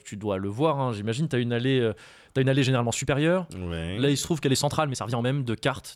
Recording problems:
uneven, jittery; strongly; from 2.5 to 5.5 s

